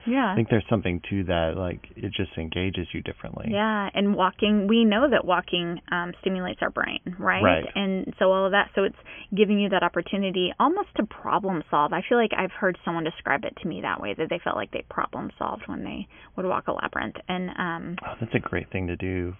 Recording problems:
high frequencies cut off; severe; nothing above 3.5 kHz

